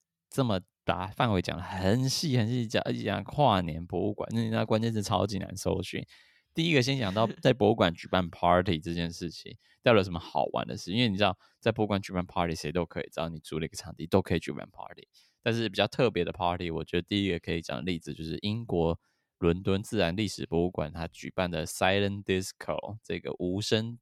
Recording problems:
none

